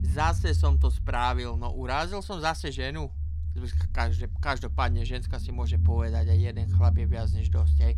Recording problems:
low rumble; noticeable; throughout; 10 dB below the speech

